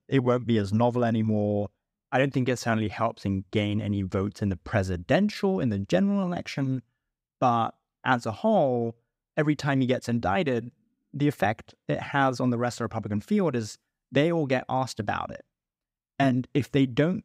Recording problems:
none

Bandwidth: 15.5 kHz